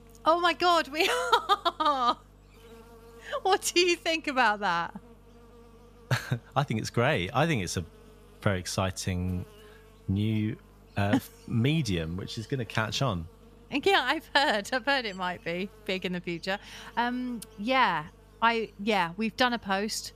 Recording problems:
electrical hum; faint; throughout; 50 Hz, 30 dB below the speech

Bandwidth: 14.5 kHz